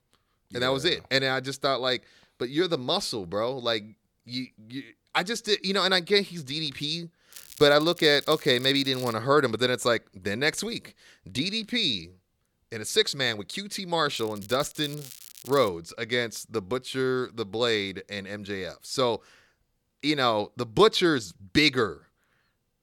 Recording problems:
crackling; noticeable; from 7.5 to 9 s and from 14 to 16 s; 20 dB below the speech

